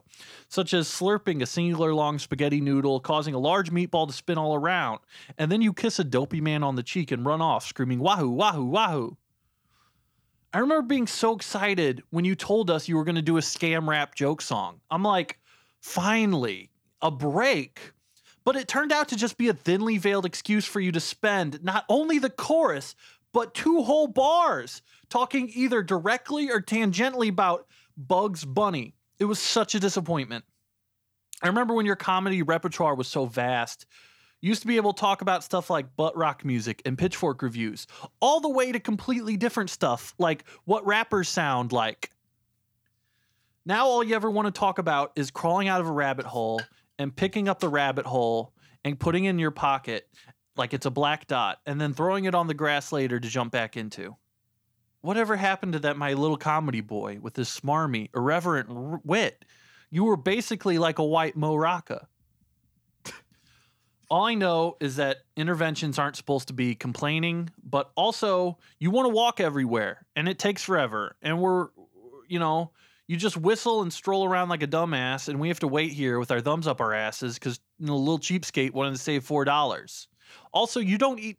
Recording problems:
none

